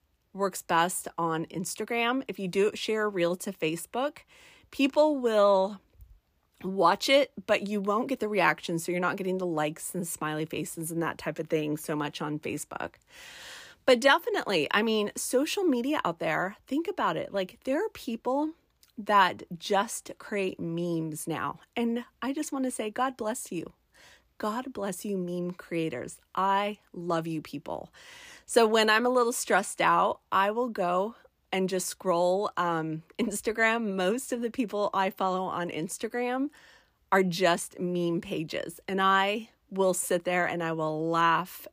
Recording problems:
uneven, jittery; slightly; from 5 to 33 s

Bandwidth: 15 kHz